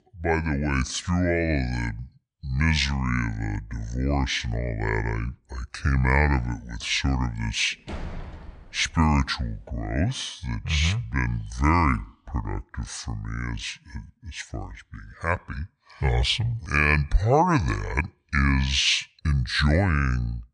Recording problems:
wrong speed and pitch; too slow and too low; 0.7 times normal speed
door banging; faint; from 8 to 9 s; peak 10 dB below the speech

